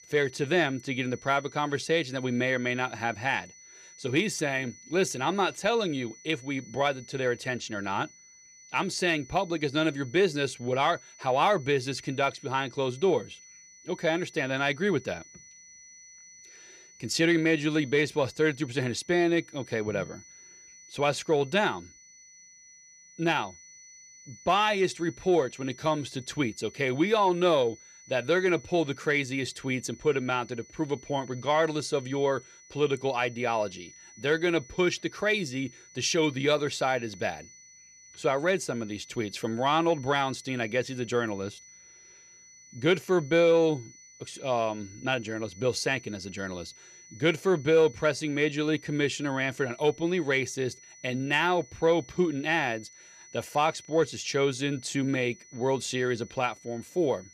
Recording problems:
high-pitched whine; faint; throughout; 6 kHz, 20 dB below the speech

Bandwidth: 15 kHz